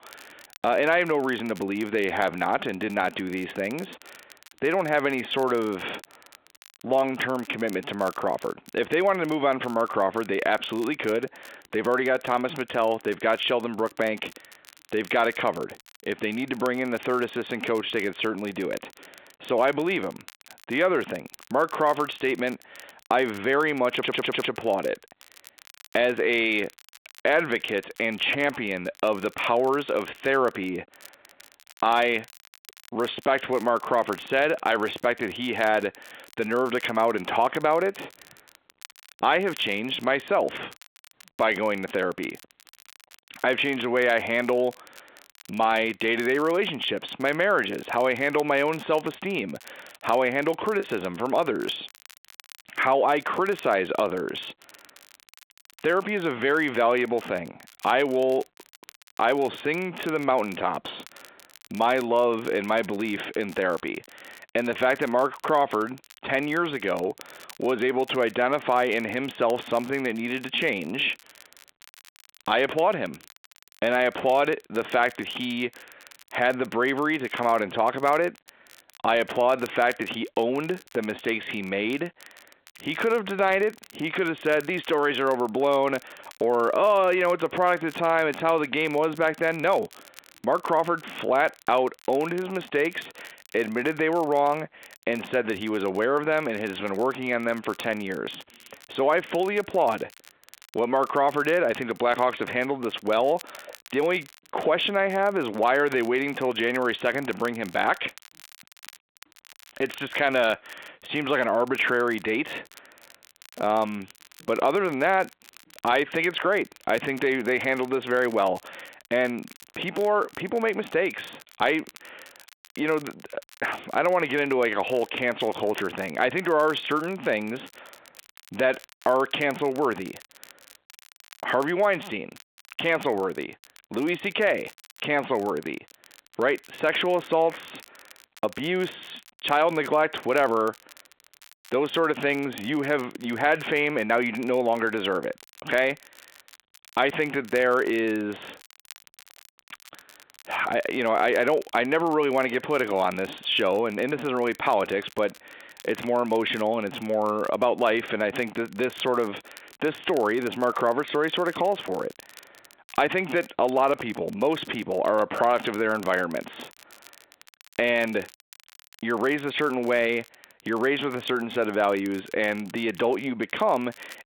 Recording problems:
squashed, flat; heavily
phone-call audio; nothing above 3.5 kHz
crackle, like an old record; faint; 25 dB below the speech
audio stuttering; at 24 s
choppy; occasionally; at 51 s; 1% of the speech affected

